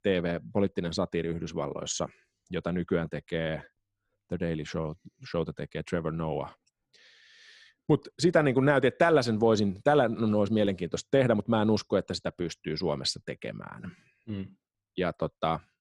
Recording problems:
none

